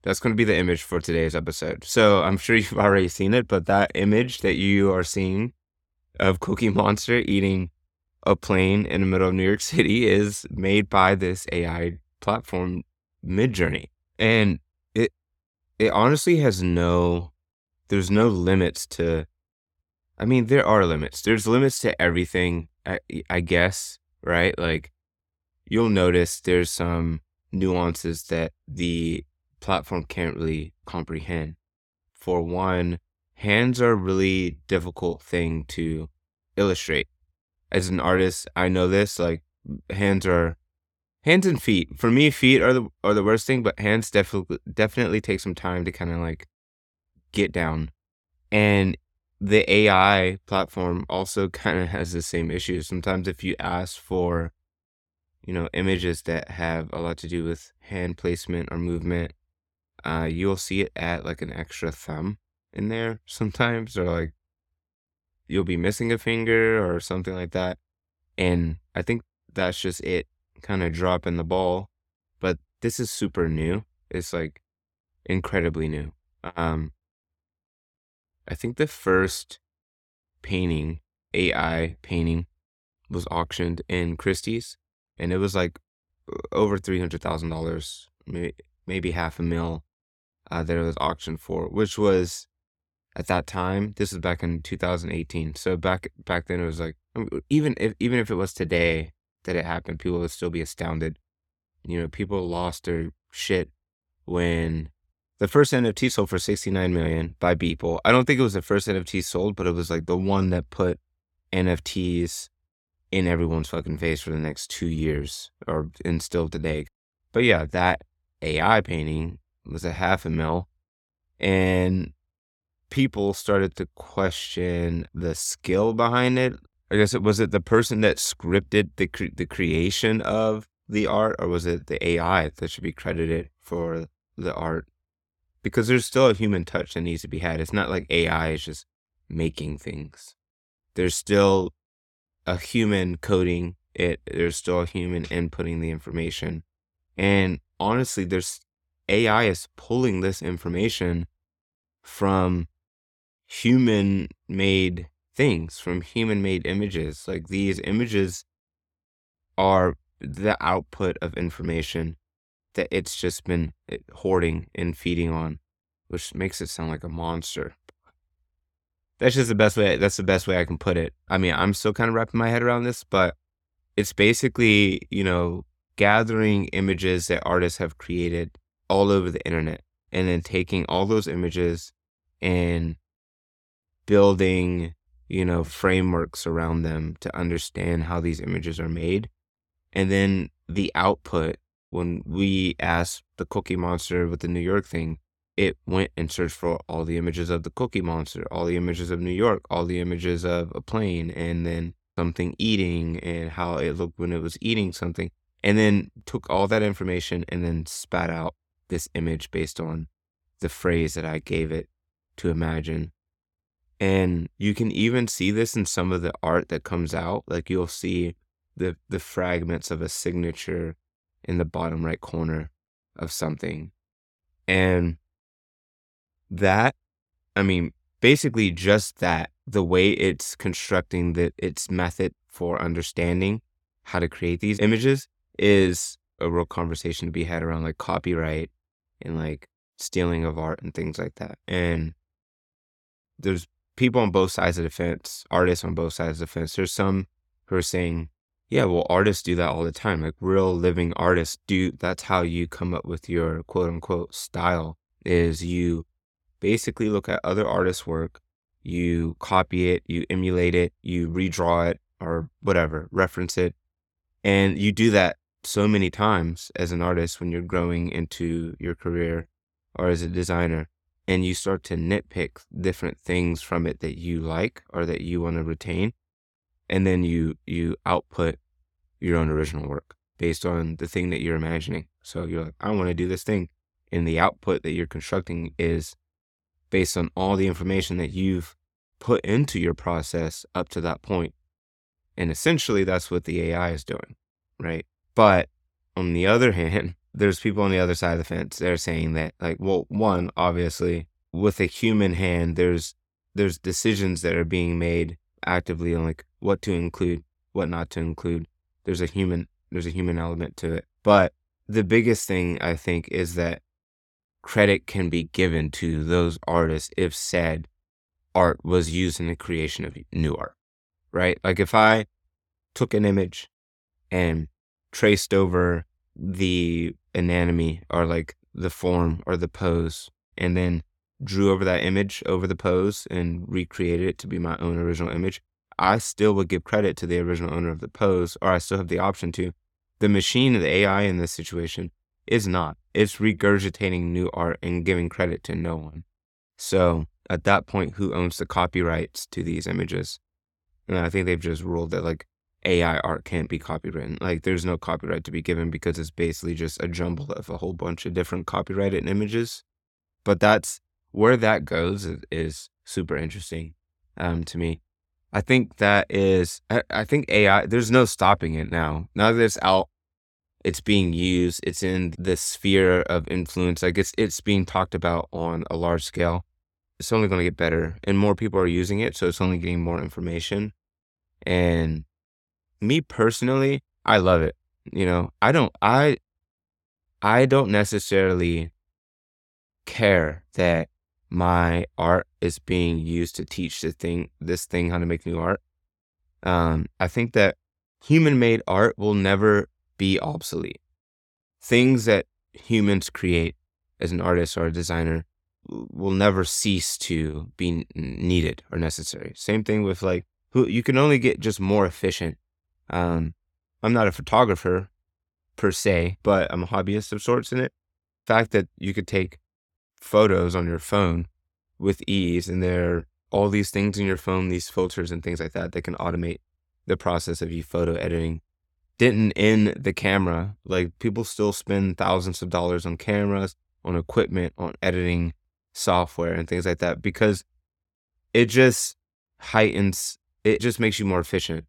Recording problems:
none

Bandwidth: 17.5 kHz